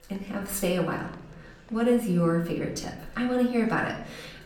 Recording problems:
off-mic speech; far
room echo; slight; dies away in 0.6 s
chatter from many people; faint; throughout; 25 dB below the speech

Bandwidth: 17.5 kHz